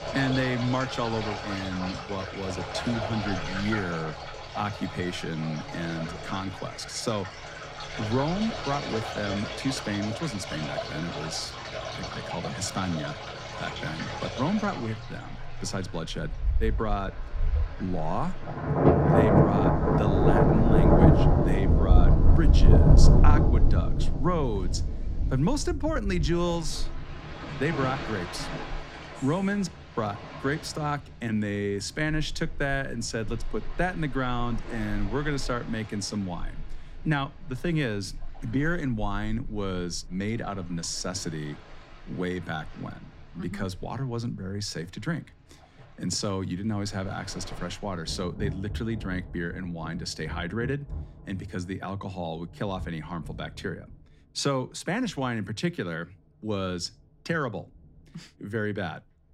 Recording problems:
rain or running water; very loud; throughout; 4 dB above the speech

